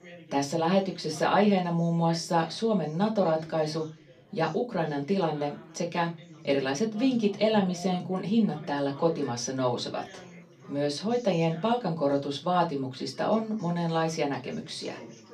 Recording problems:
off-mic speech; far
room echo; very slight; dies away in 0.2 s
background chatter; faint; throughout; 3 voices, 20 dB below the speech

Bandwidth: 15 kHz